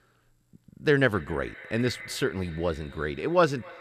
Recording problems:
echo of what is said; noticeable; throughout; 260 ms later, 15 dB below the speech

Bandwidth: 14.5 kHz